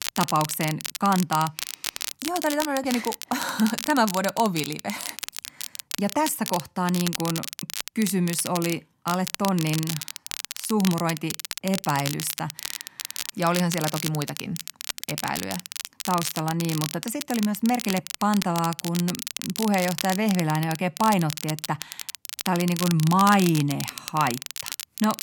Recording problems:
crackle, like an old record; loud; 7 dB below the speech

